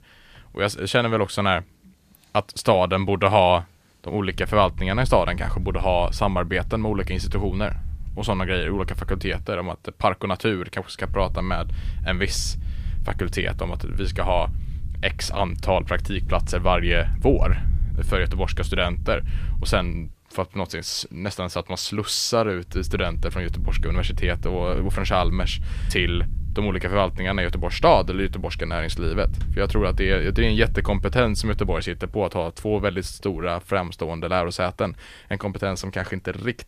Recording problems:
low rumble; faint; from 4.5 to 9.5 s, from 11 to 20 s and from 23 to 32 s; 25 dB below the speech

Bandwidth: 14.5 kHz